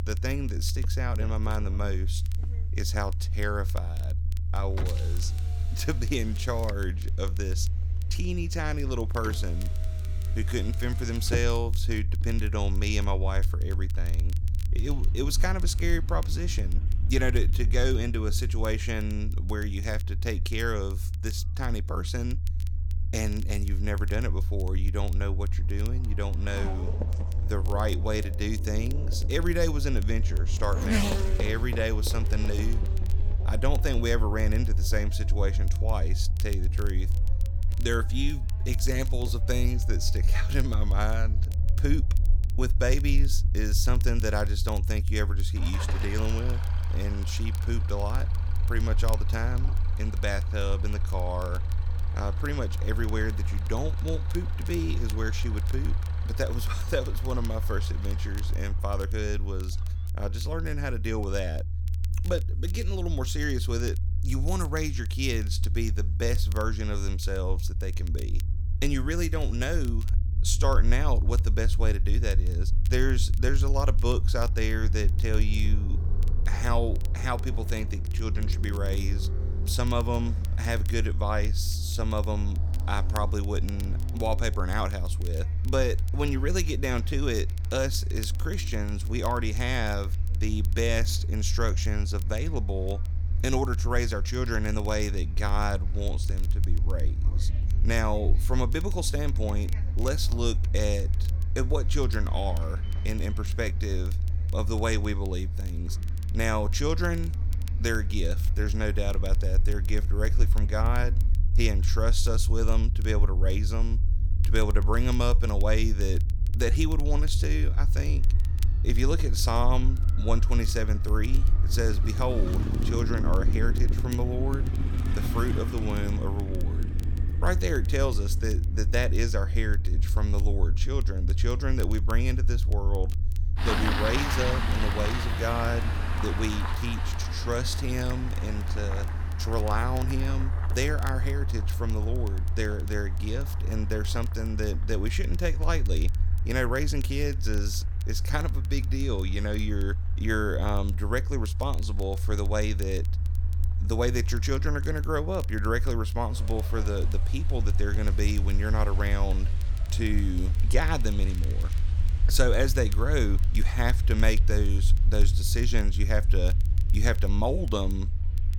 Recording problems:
traffic noise; loud; throughout; 9 dB below the speech
low rumble; noticeable; throughout; 15 dB below the speech
crackle, like an old record; faint; 20 dB below the speech

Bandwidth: 18.5 kHz